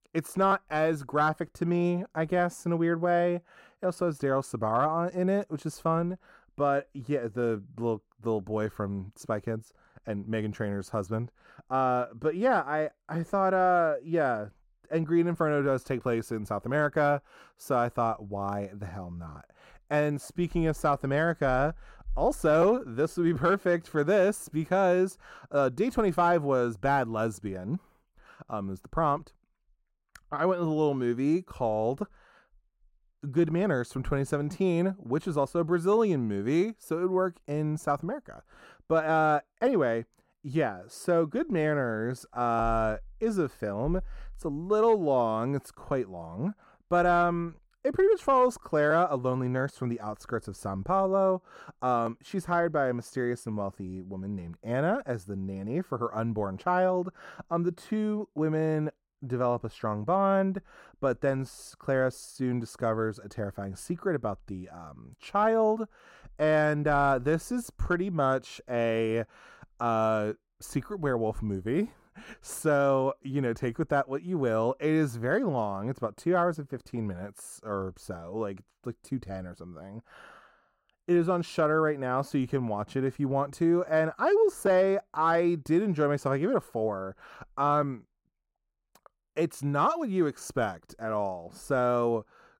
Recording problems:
muffled; slightly; fading above 2 kHz

